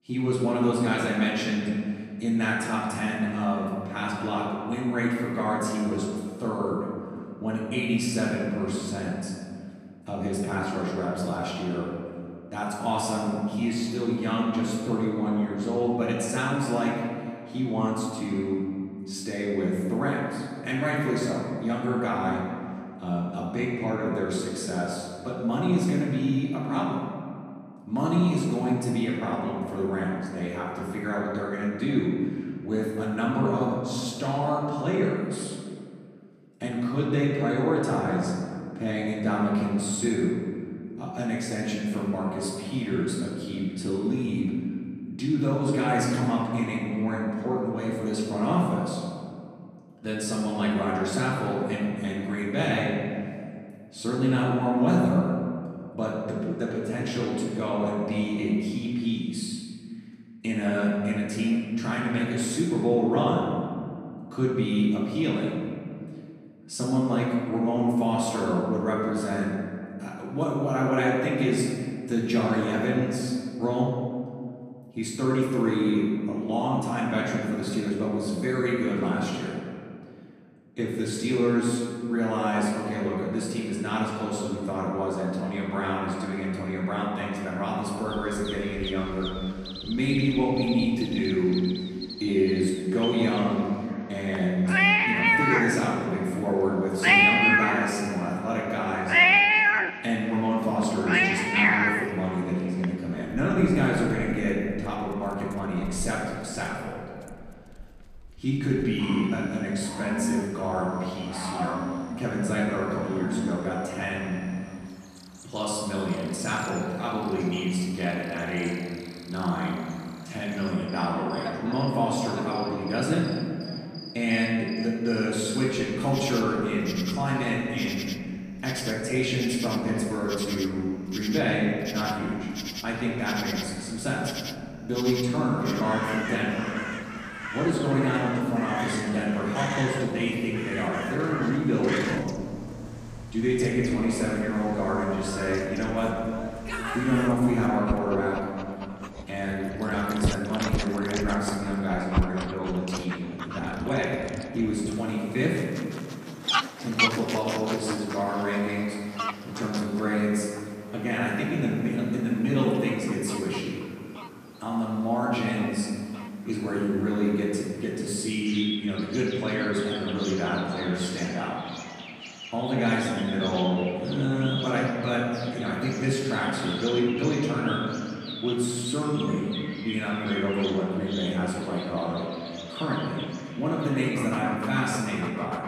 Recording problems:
off-mic speech; far
room echo; noticeable; dies away in 1.8 s
animal sounds; loud; from 1:28 on; 2 dB below the speech

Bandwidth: 14.5 kHz